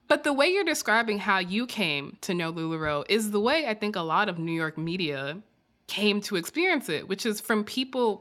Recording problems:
none

